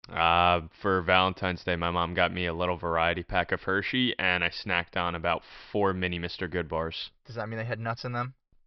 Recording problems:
high frequencies cut off; noticeable; nothing above 5.5 kHz

